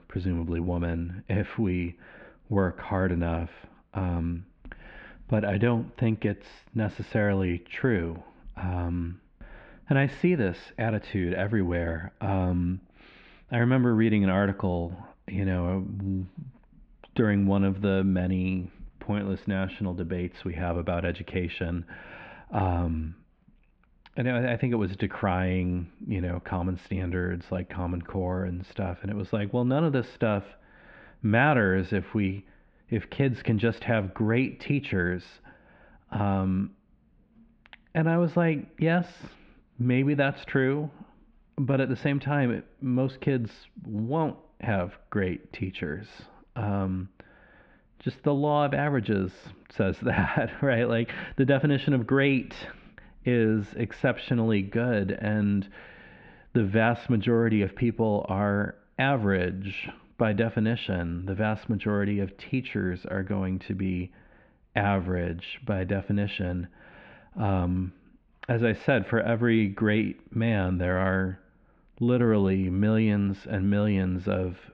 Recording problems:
muffled; very; fading above 3 kHz

